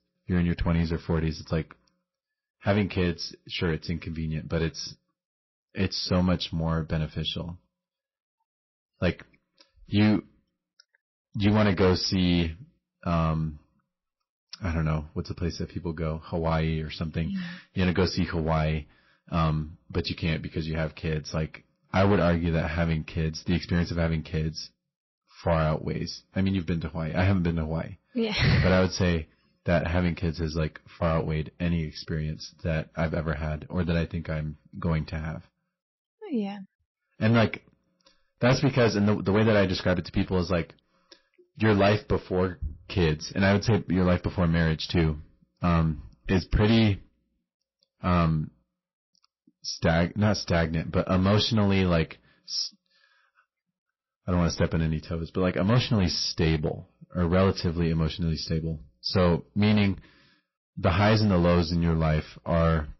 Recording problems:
distortion; slight; 5% of the sound clipped
garbled, watery; slightly; nothing above 5.5 kHz

